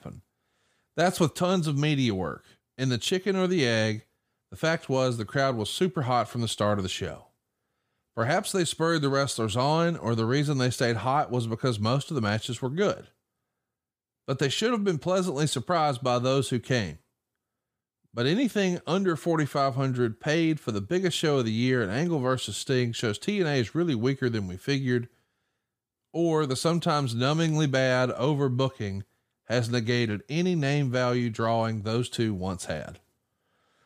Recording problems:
none

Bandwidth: 15 kHz